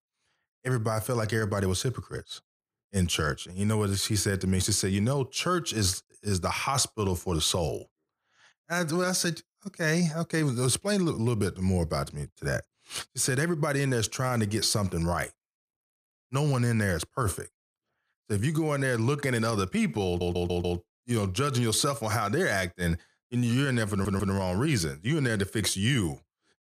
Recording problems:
audio stuttering; at 20 s and at 24 s

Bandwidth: 15 kHz